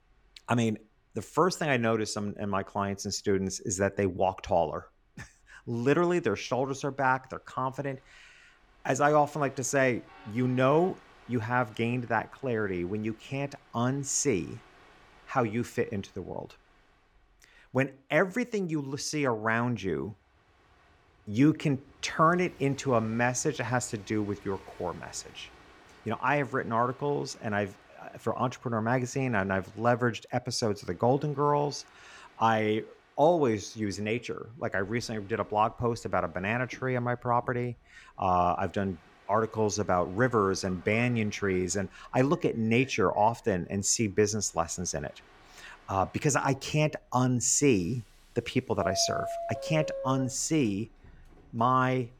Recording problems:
train or aircraft noise; noticeable; throughout; 20 dB below the speech

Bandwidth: 18 kHz